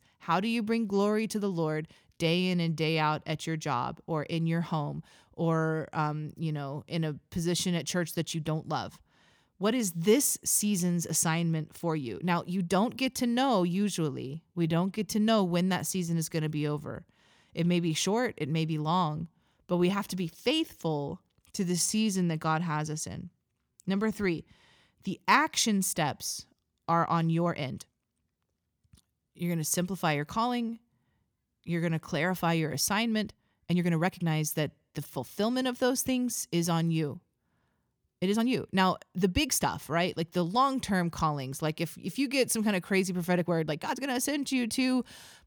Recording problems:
uneven, jittery; strongly; from 2 to 44 s

